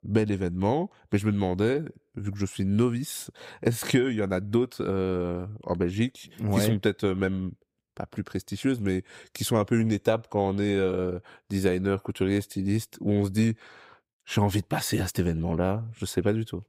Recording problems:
none

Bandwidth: 15.5 kHz